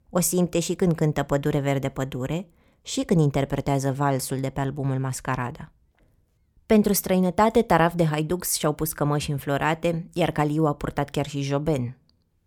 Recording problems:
none

